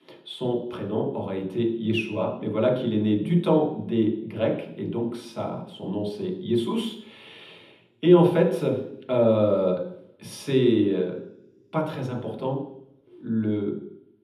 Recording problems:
off-mic speech; far
room echo; noticeable; dies away in 0.8 s

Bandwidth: 13.5 kHz